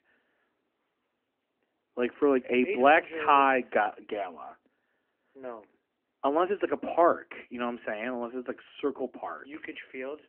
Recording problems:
phone-call audio; nothing above 3 kHz

